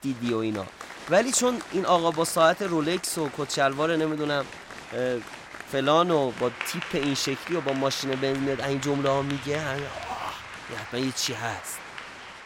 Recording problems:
crowd noise; noticeable; throughout; 10 dB below the speech
rain or running water; faint; throughout; 30 dB below the speech

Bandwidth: 16 kHz